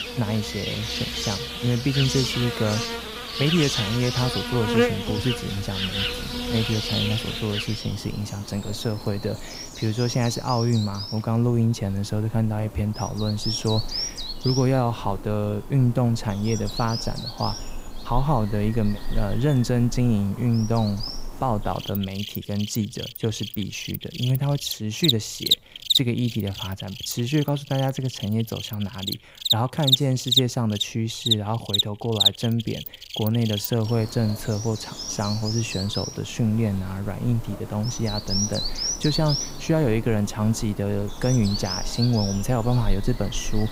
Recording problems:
animal sounds; loud; throughout; 2 dB below the speech

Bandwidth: 15.5 kHz